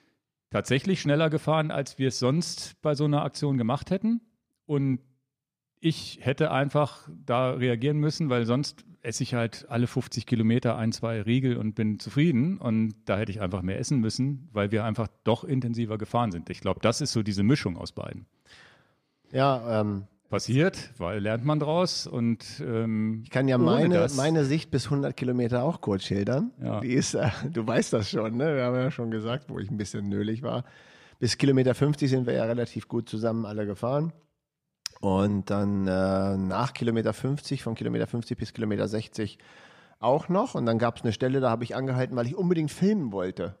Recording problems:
none

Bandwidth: 14.5 kHz